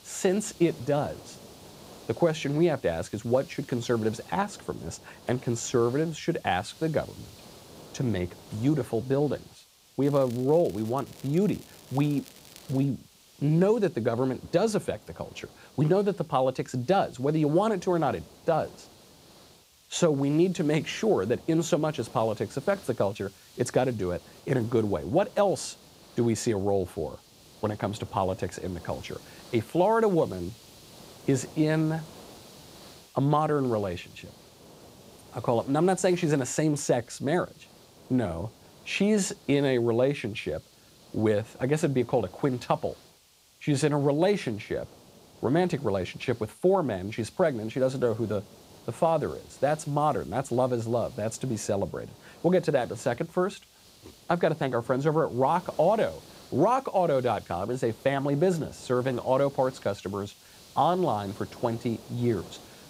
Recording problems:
hiss; faint; throughout; 25 dB below the speech
crackling; faint; from 10 to 13 s; 25 dB below the speech

